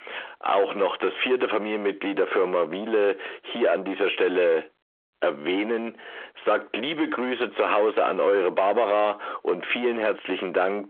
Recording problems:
squashed, flat; heavily
phone-call audio; nothing above 3.5 kHz
distortion; slight; 10 dB below the speech

